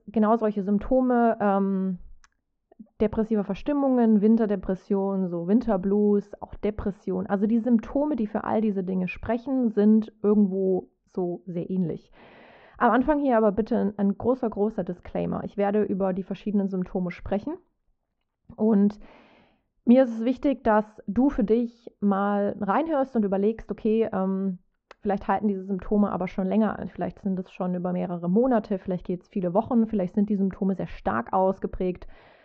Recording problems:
muffled; very; fading above 2.5 kHz
high frequencies cut off; noticeable; nothing above 8 kHz

